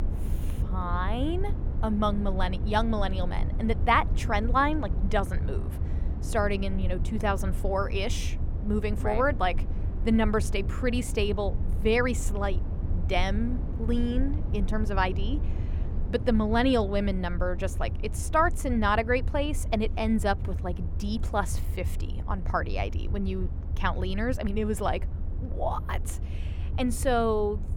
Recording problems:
low rumble; noticeable; throughout; 15 dB below the speech

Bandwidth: 18.5 kHz